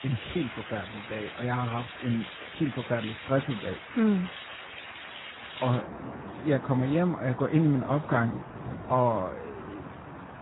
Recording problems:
garbled, watery; badly; nothing above 4 kHz
rain or running water; noticeable; throughout; 10 dB below the speech

